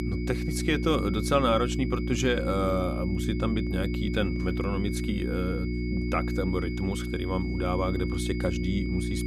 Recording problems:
electrical hum; loud; throughout; 60 Hz, 7 dB below the speech
high-pitched whine; noticeable; throughout; 2 kHz, 15 dB below the speech

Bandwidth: 14 kHz